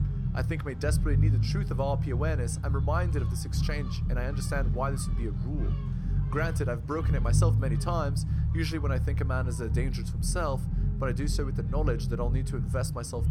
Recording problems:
low rumble; loud; throughout; 8 dB below the speech
animal sounds; faint; throughout; 20 dB below the speech

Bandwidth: 17 kHz